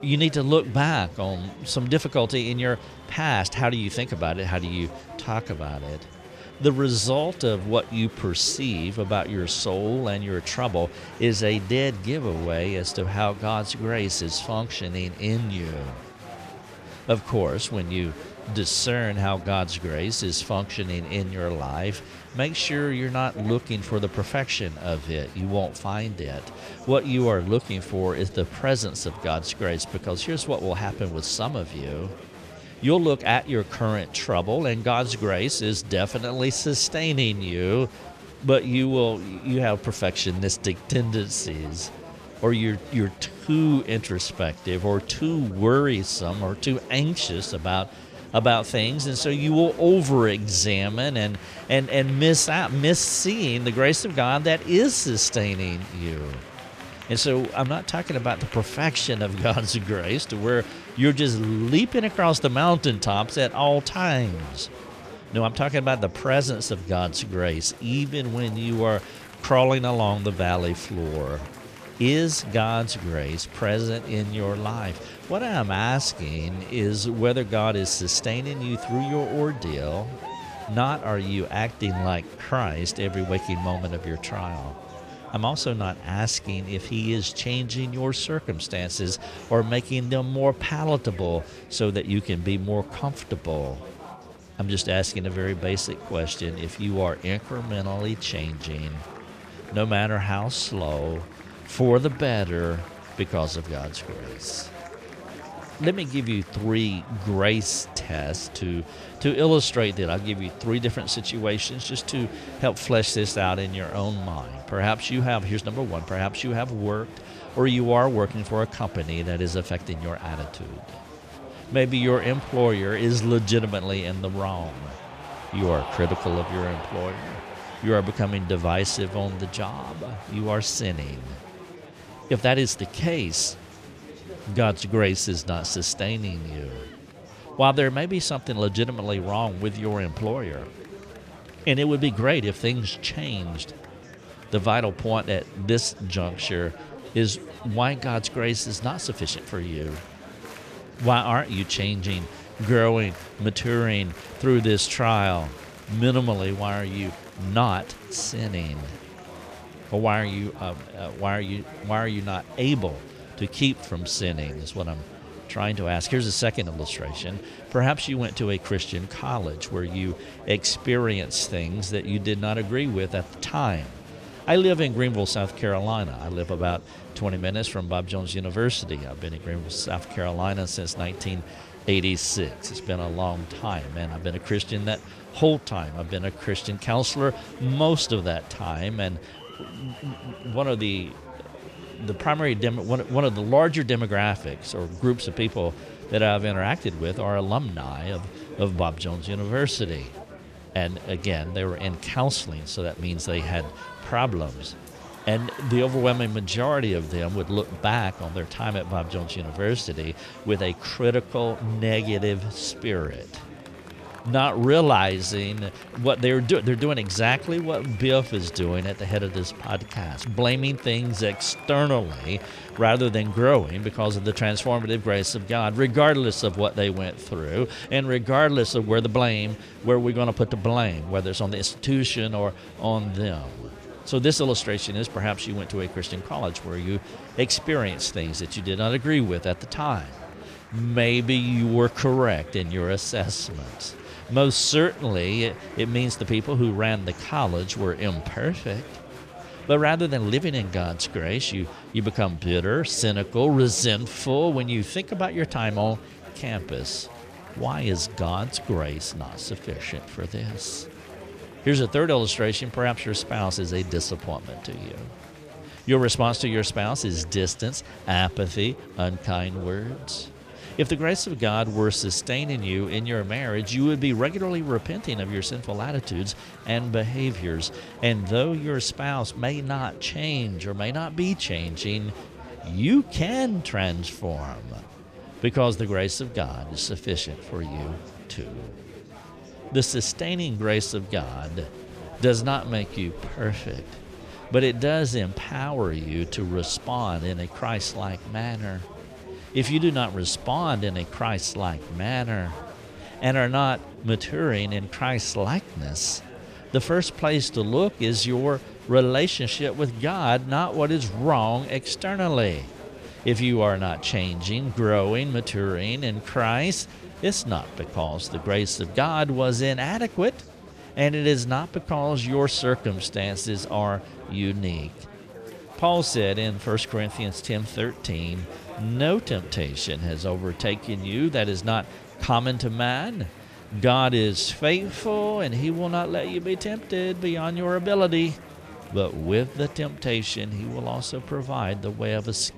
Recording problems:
chatter from many people; noticeable; throughout; 15 dB below the speech

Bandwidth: 14.5 kHz